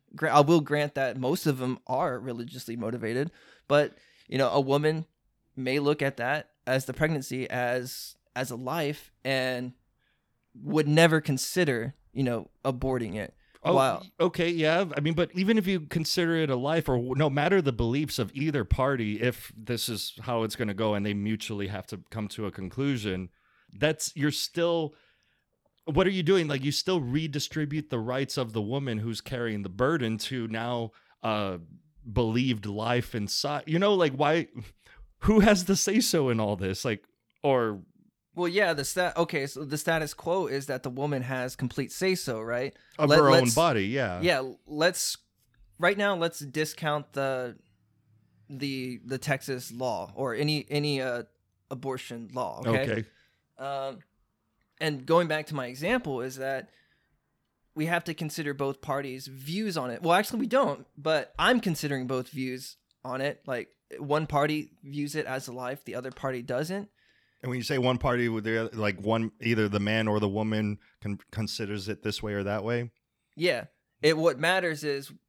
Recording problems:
none

